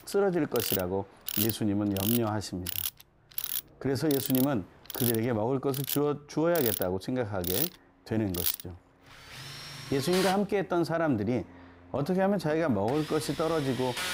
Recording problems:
machinery noise; loud; throughout; 4 dB below the speech
train or aircraft noise; faint; throughout; 30 dB below the speech

